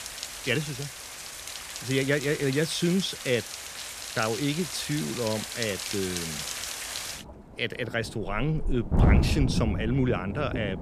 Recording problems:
rain or running water; loud; throughout; 3 dB below the speech

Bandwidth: 15 kHz